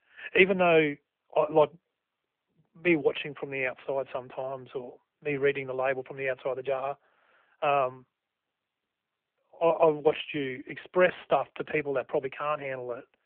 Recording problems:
phone-call audio

